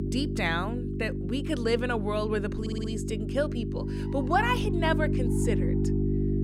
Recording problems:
electrical hum; loud; throughout; 50 Hz, 7 dB below the speech
animal sounds; faint; from 4 s on; 25 dB below the speech
audio stuttering; at 2.5 s

